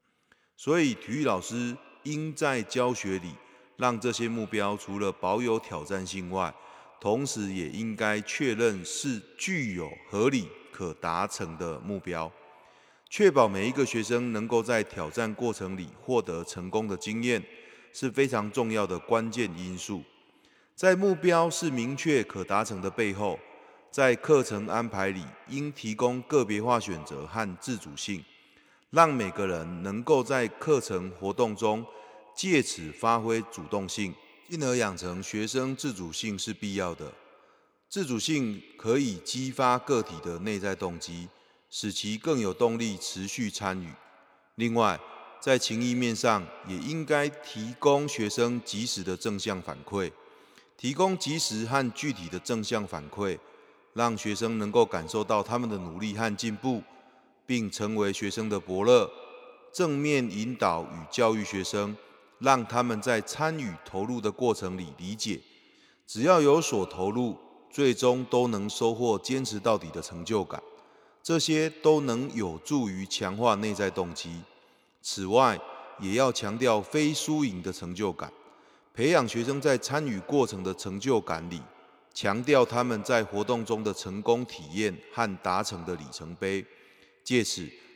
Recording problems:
echo of what is said; faint; throughout; 90 ms later, 20 dB below the speech

